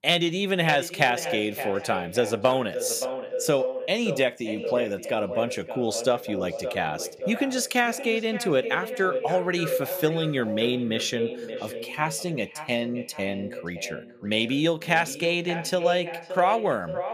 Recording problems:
echo of what is said; strong; throughout; 570 ms later, 8 dB below the speech

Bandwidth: 15 kHz